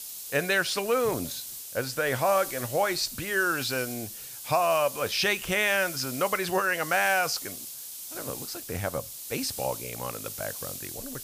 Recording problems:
hiss; loud; throughout; 9 dB below the speech

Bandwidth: 15 kHz